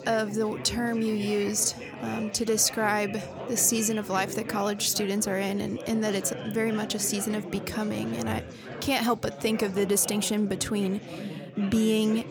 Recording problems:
chatter from many people; noticeable; throughout; 10 dB below the speech

